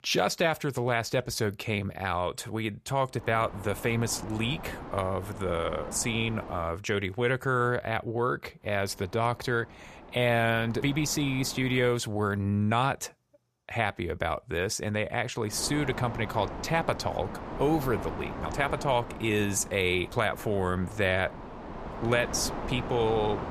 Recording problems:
wind noise on the microphone; occasional gusts; from 3 to 6.5 s, from 8.5 to 12 s and from 16 s on; 10 dB below the speech

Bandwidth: 14.5 kHz